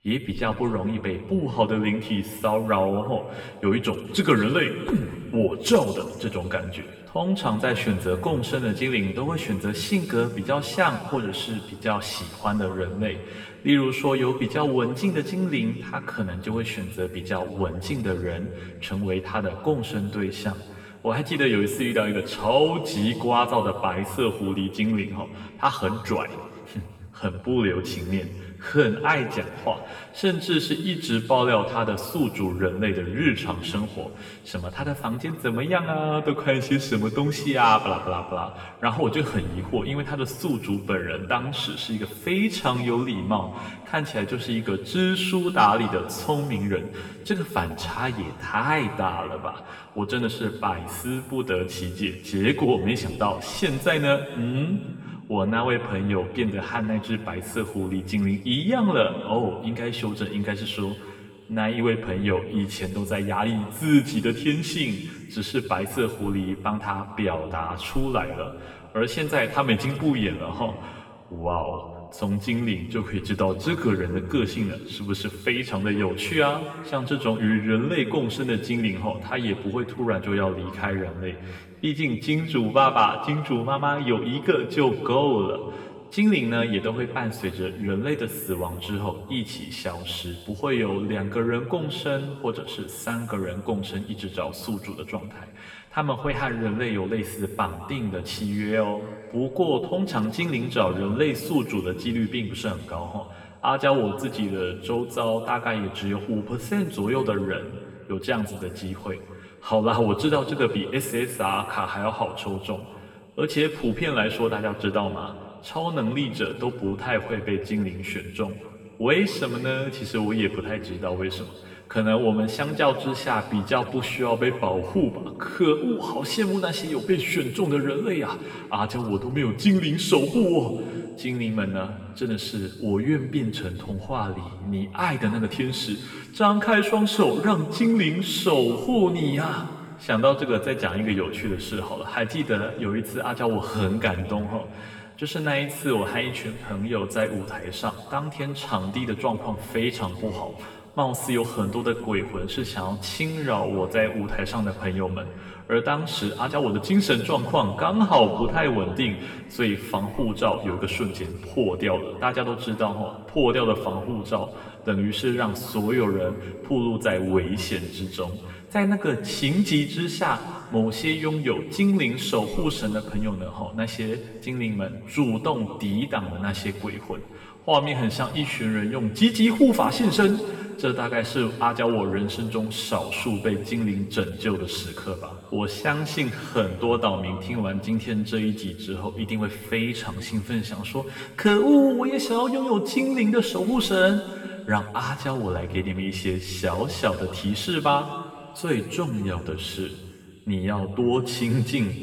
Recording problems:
off-mic speech; far
room echo; noticeable; dies away in 1.9 s

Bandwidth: 19 kHz